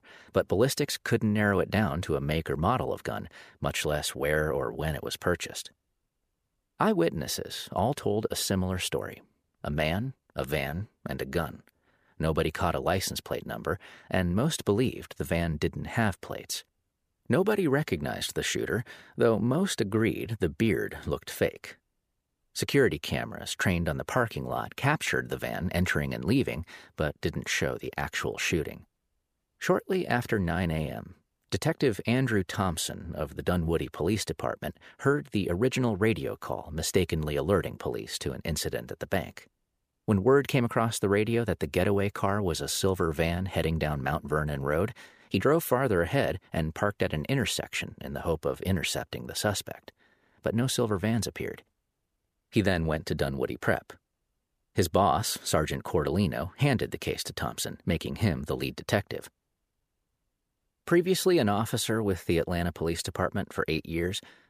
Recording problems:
none

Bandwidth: 15 kHz